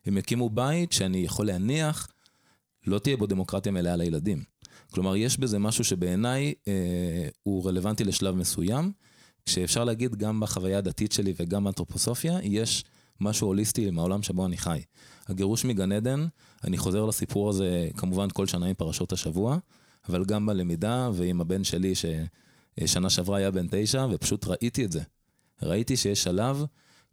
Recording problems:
none

